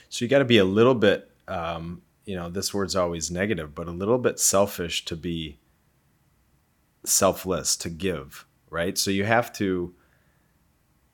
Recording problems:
none

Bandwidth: 18 kHz